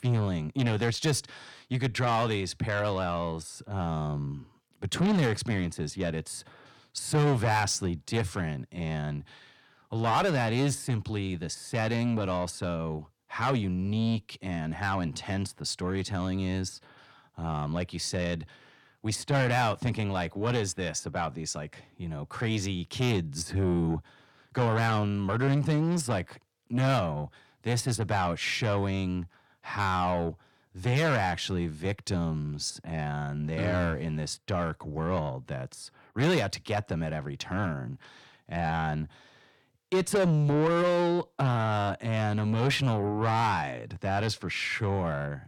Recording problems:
distortion; heavy; 8 dB below the speech

